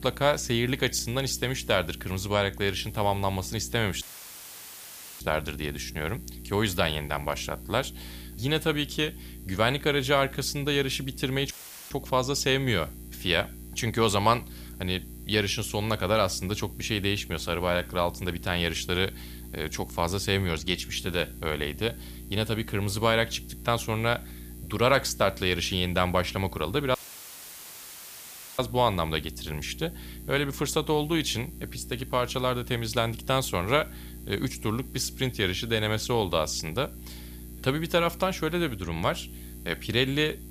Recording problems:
electrical hum; faint; throughout; 60 Hz, 25 dB below the speech
audio cutting out; filled with static; at 4 s for 1 s, at 12 s and at 27 s for 1.5 s

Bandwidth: 15 kHz